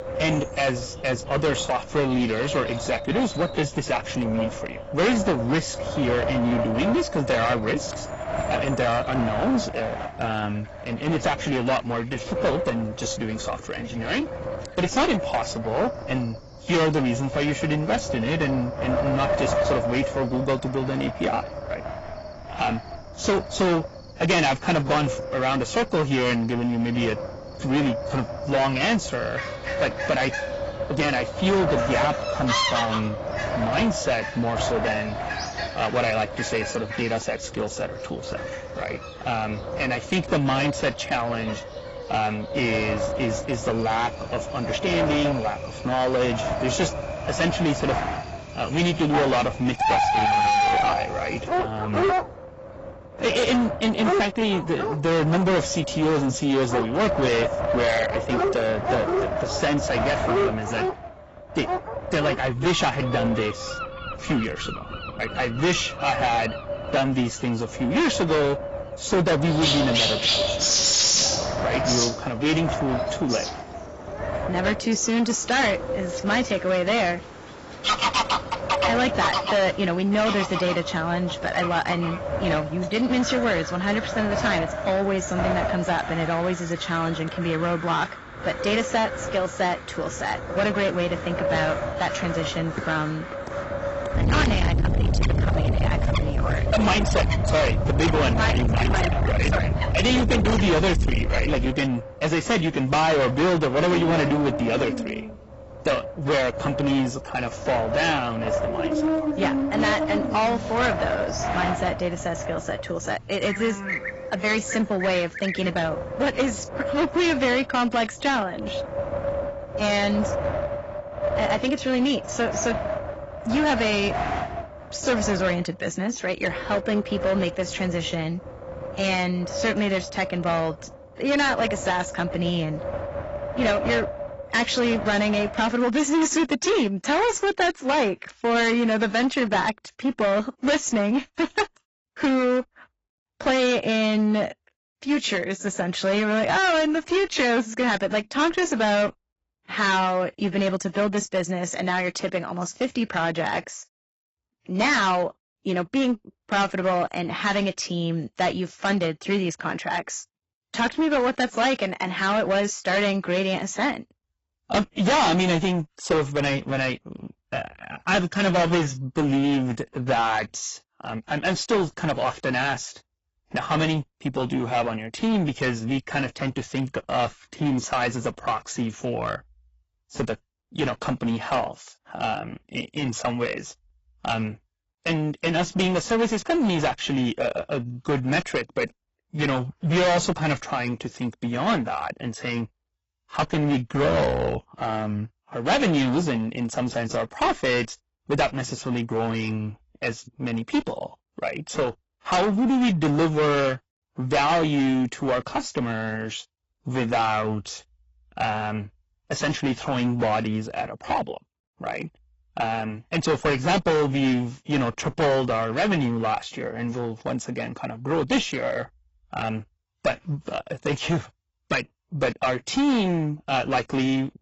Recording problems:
distortion; heavy; 13% of the sound clipped
garbled, watery; badly; nothing above 7.5 kHz
wind noise on the microphone; heavy; until 2:16; 6 dB below the speech
animal sounds; loud; until 1:56; 2 dB below the speech

